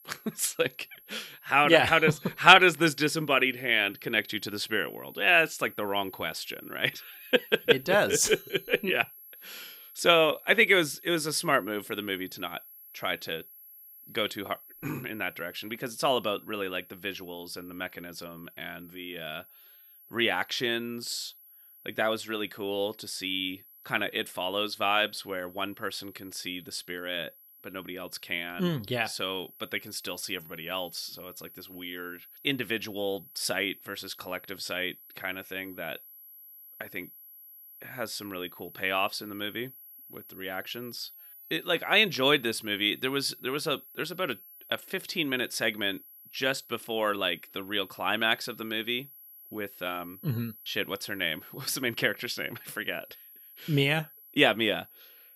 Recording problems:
high-pitched whine; faint; throughout; 11.5 kHz, 20 dB below the speech

